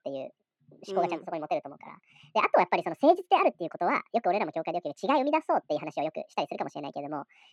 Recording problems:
wrong speed and pitch; too fast and too high; 1.6 times normal speed
muffled; slightly; fading above 3 kHz

